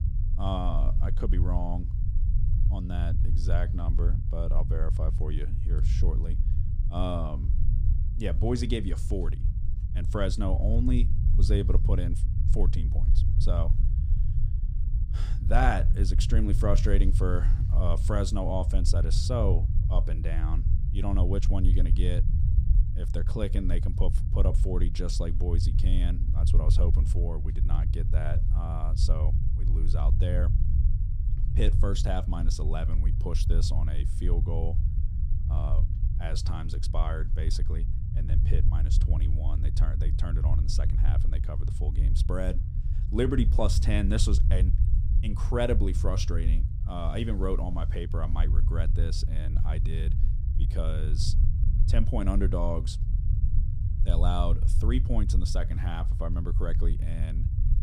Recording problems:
low rumble; loud; throughout; 9 dB below the speech

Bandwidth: 15.5 kHz